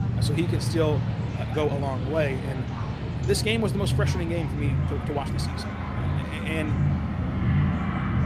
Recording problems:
low rumble; loud; throughout; 9 dB below the speech
train or aircraft noise; noticeable; throughout; 10 dB below the speech
chatter from many people; noticeable; throughout; 15 dB below the speech
uneven, jittery; slightly; from 1.5 to 6 s

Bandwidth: 14.5 kHz